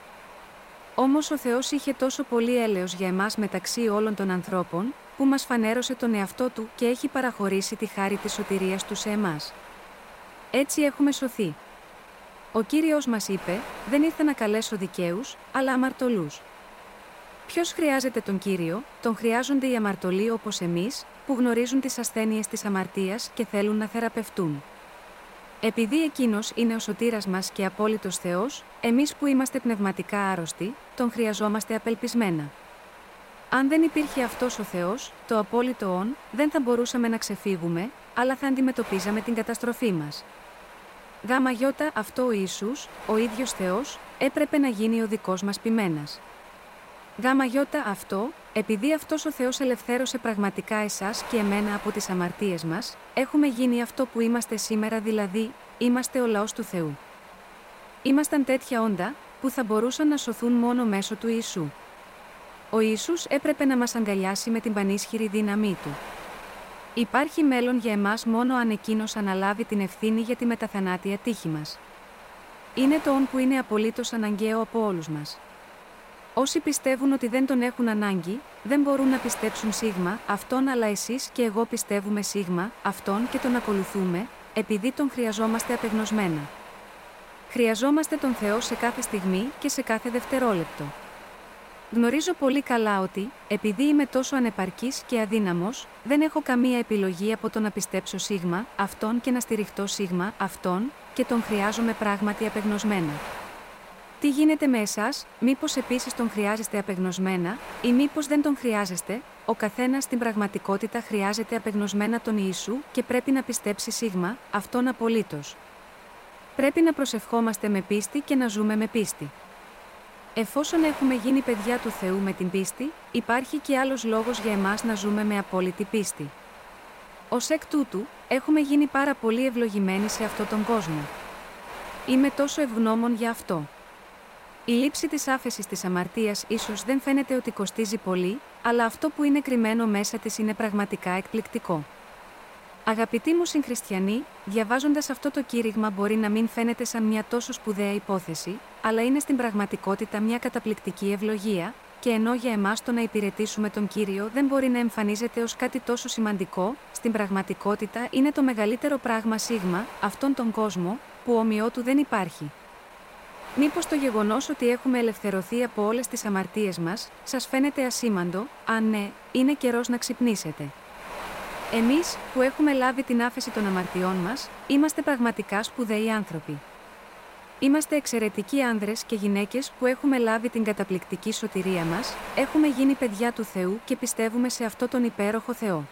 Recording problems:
wind noise on the microphone; occasional gusts; 15 dB below the speech

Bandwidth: 16 kHz